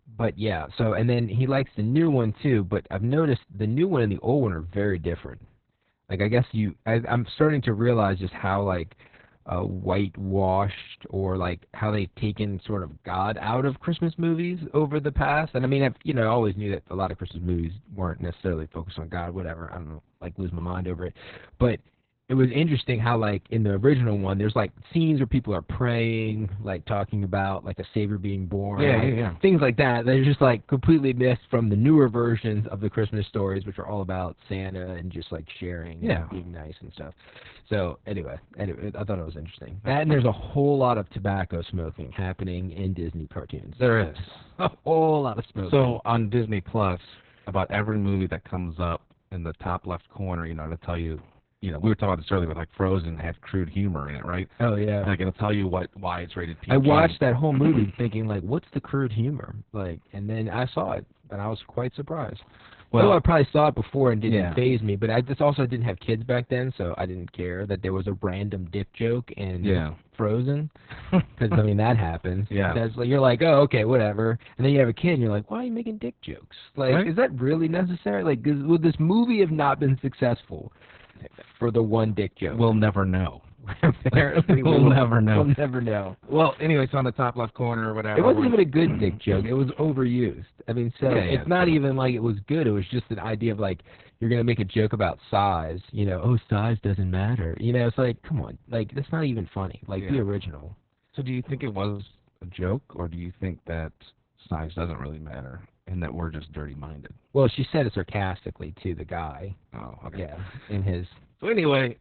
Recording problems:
garbled, watery; badly; nothing above 4 kHz

